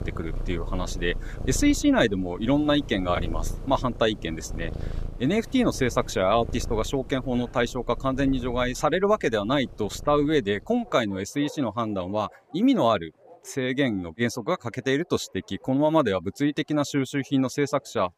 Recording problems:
animal sounds; noticeable; throughout; 15 dB below the speech

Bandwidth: 15 kHz